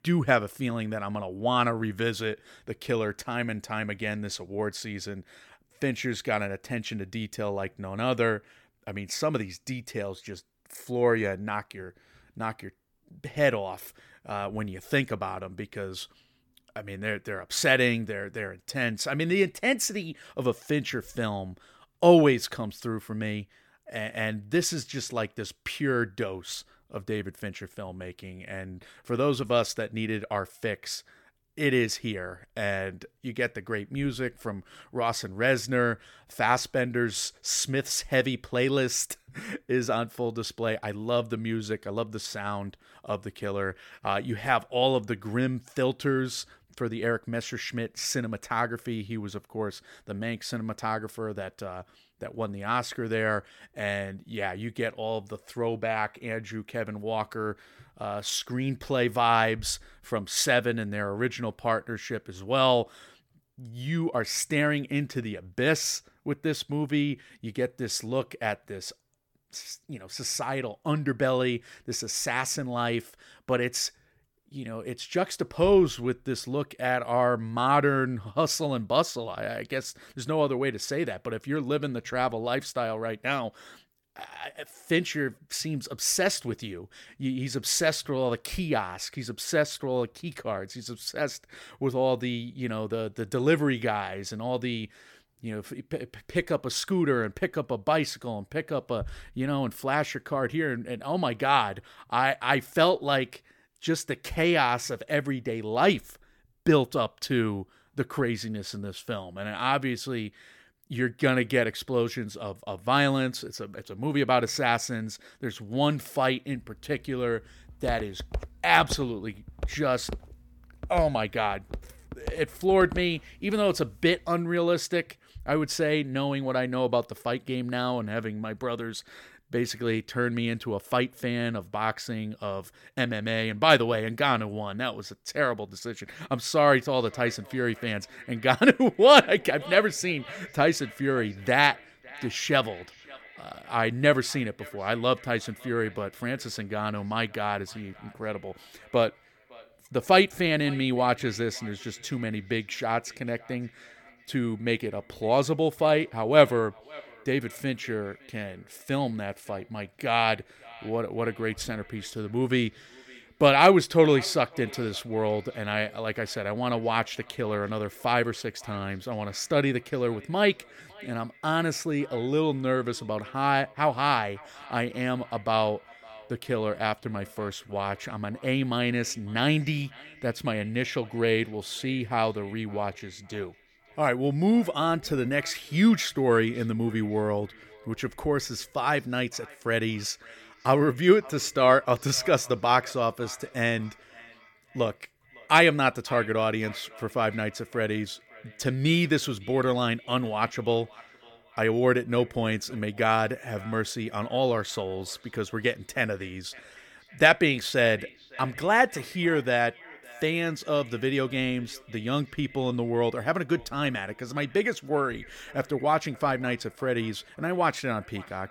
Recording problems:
echo of what is said; faint; from 2:17 on; 560 ms later, 20 dB below the speech
footsteps; faint; from 1:58 to 2:03; peak 10 dB below the speech

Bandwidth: 17.5 kHz